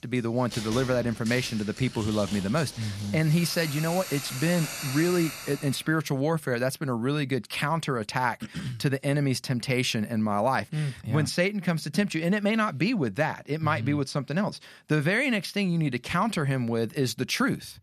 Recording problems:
household noises; loud; until 5.5 s; 10 dB below the speech

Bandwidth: 14 kHz